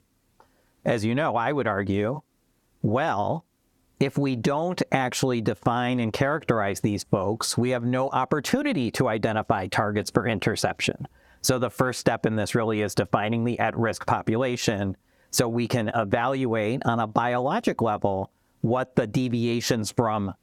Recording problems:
squashed, flat; somewhat

